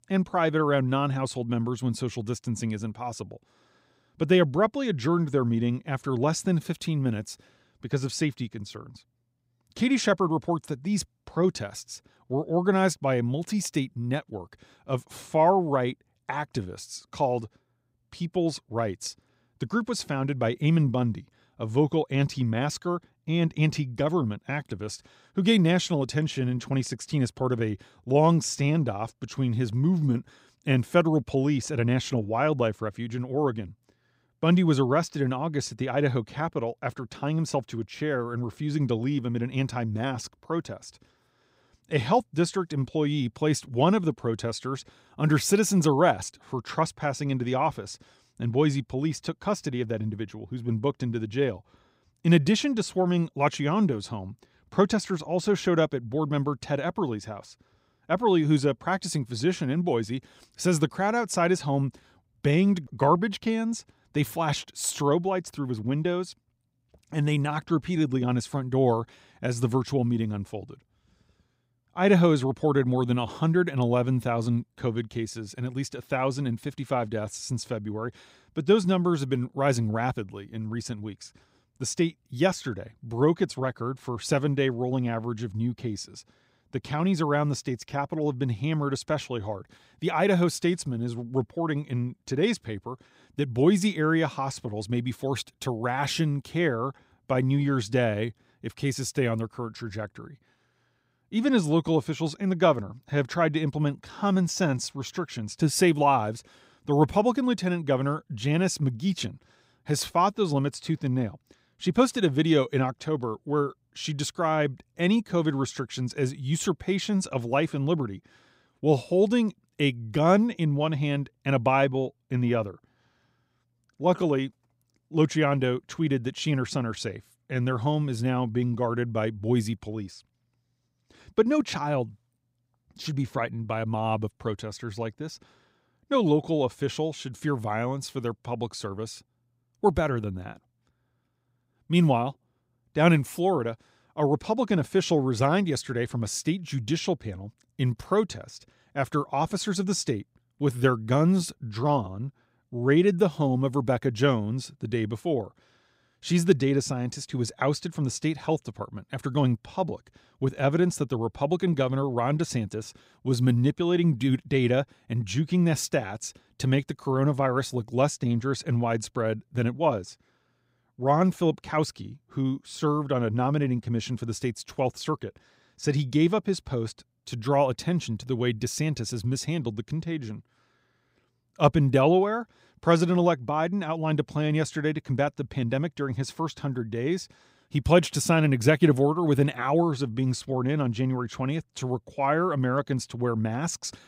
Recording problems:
none

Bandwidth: 15.5 kHz